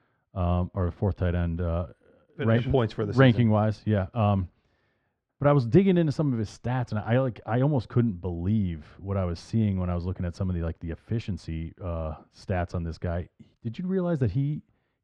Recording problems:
muffled; very; fading above 2 kHz

